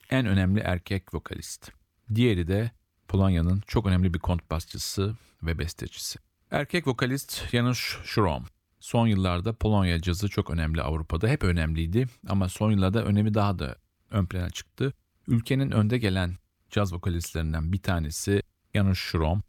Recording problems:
none

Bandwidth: 18.5 kHz